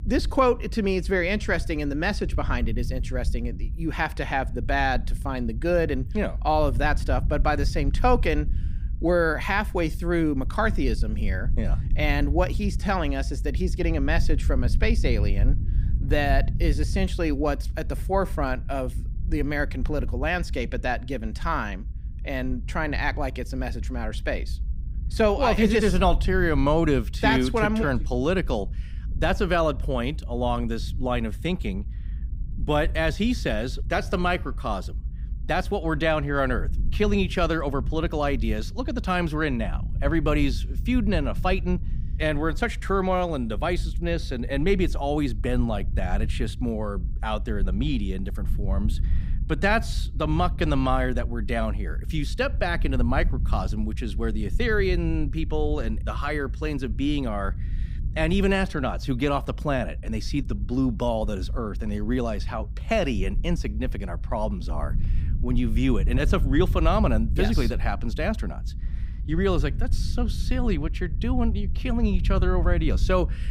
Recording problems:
low rumble; faint; throughout; 20 dB below the speech

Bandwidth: 15.5 kHz